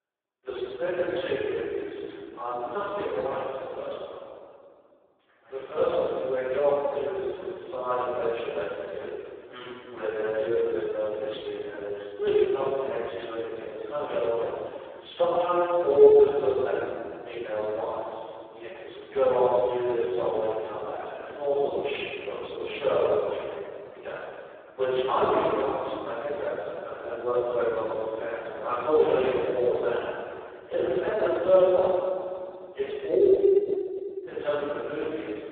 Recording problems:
phone-call audio; poor line; nothing above 3.5 kHz
room echo; strong; dies away in 2.2 s
off-mic speech; far

